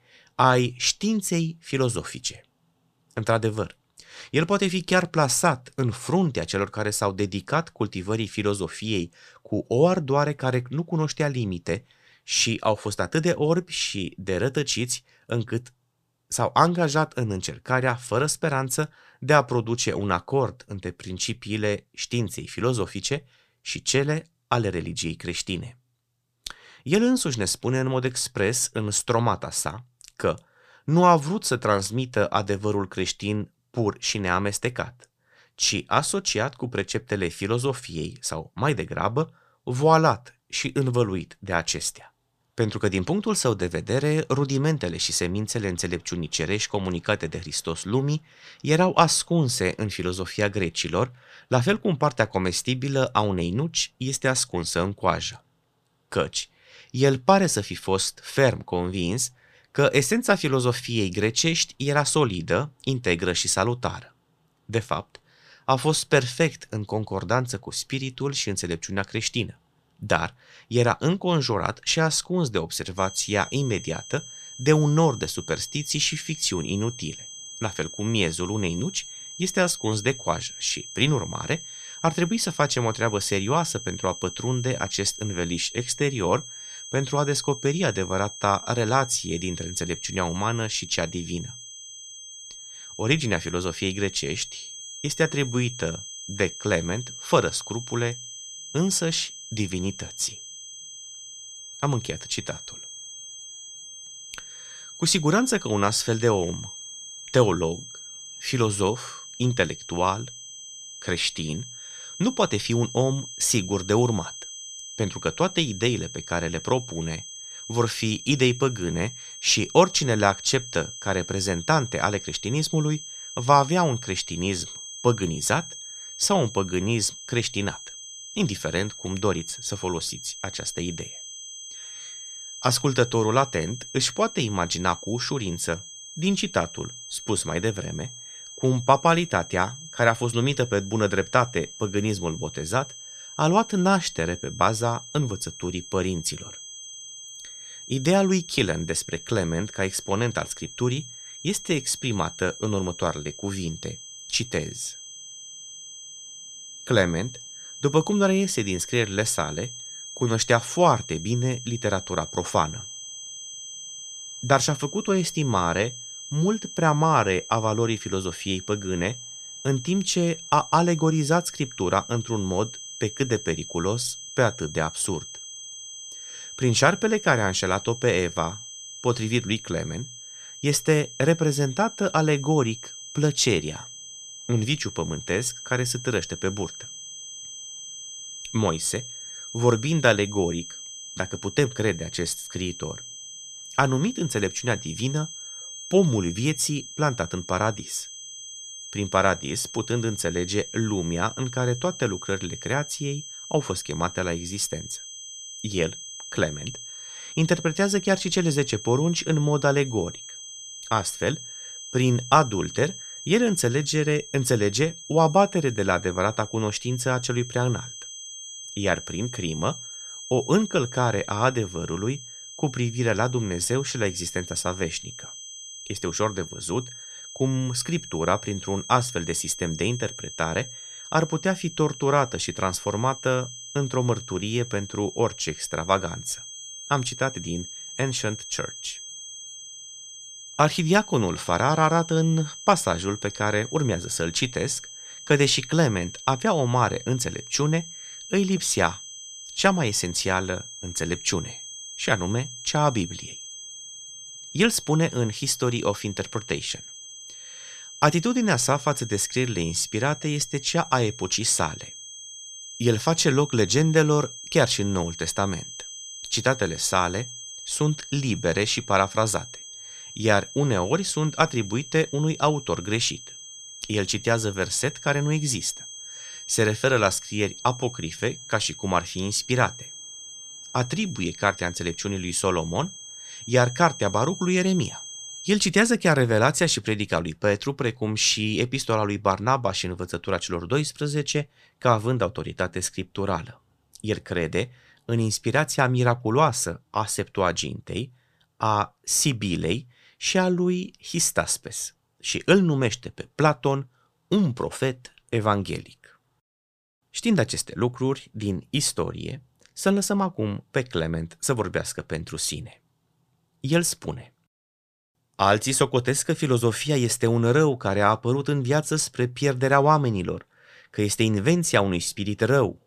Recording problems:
high-pitched whine; noticeable; from 1:13 to 4:46; 6.5 kHz, 10 dB below the speech

